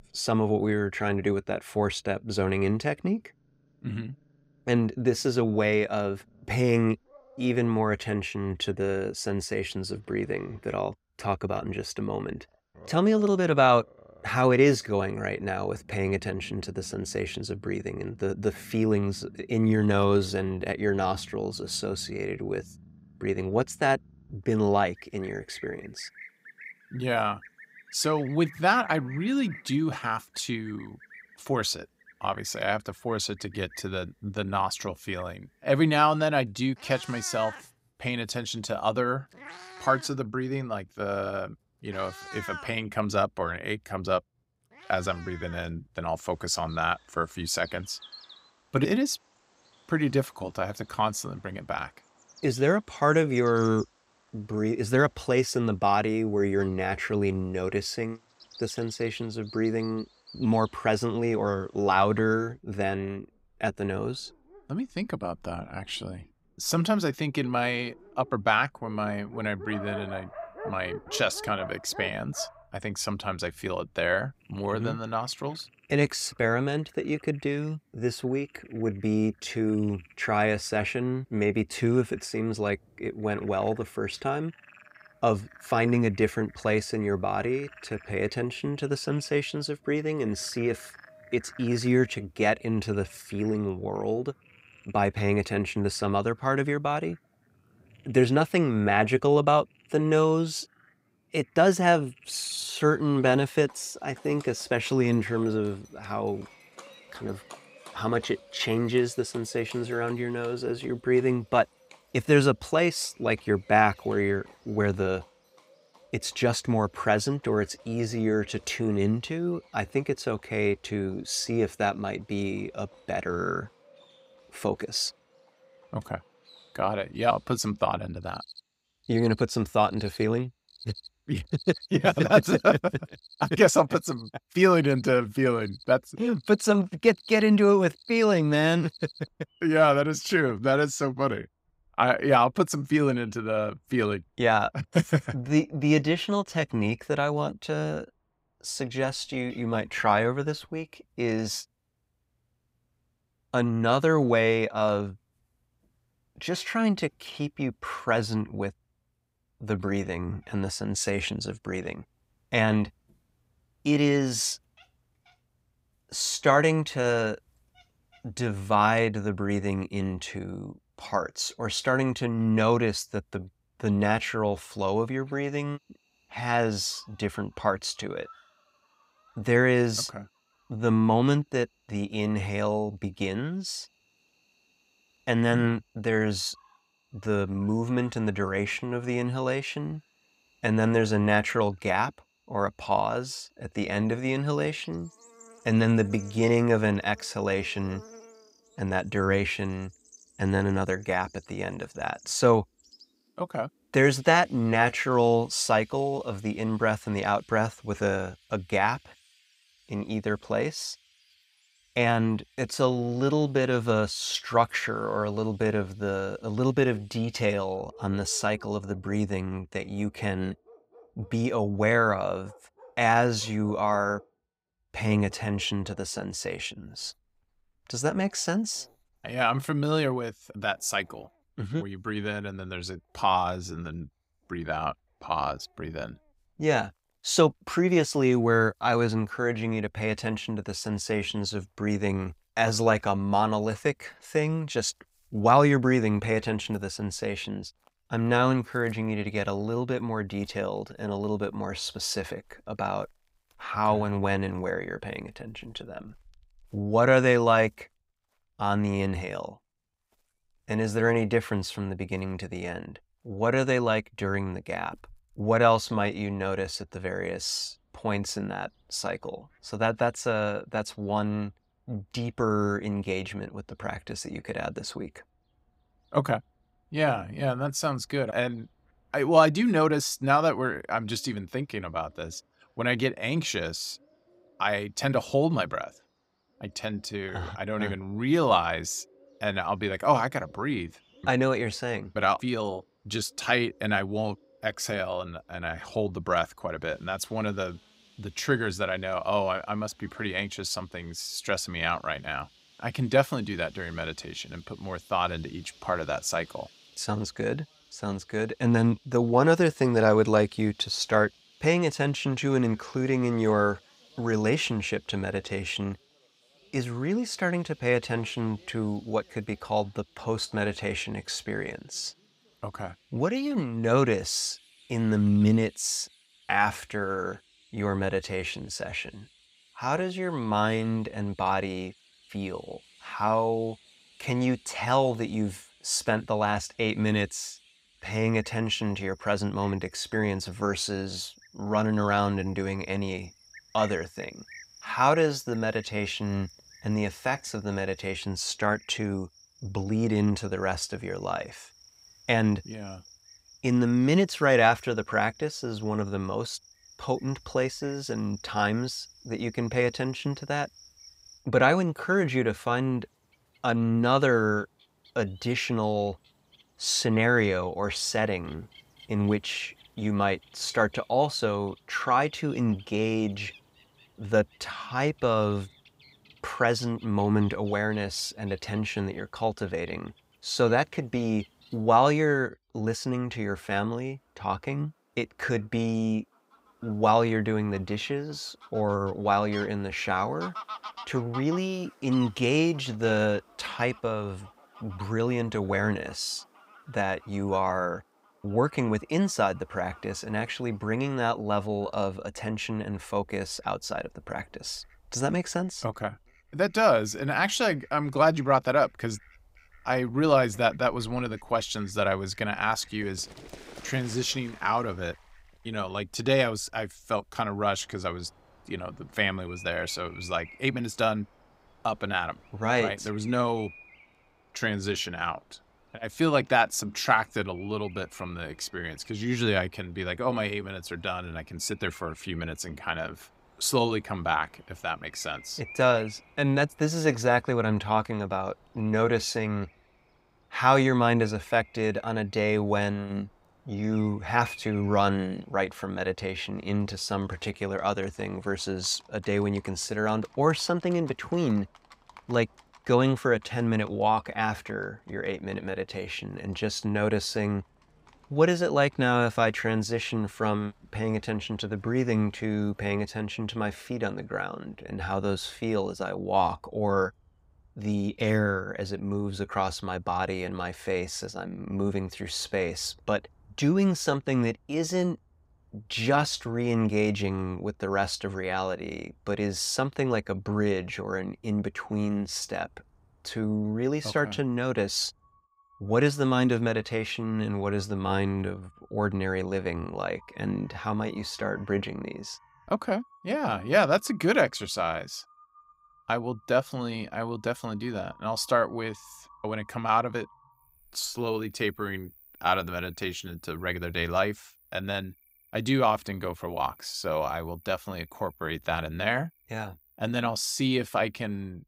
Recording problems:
animal sounds; faint; throughout; 25 dB below the speech

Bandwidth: 15.5 kHz